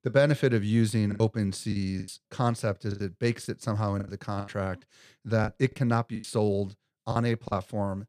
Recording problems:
choppy; very; 11% of the speech affected

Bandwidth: 14.5 kHz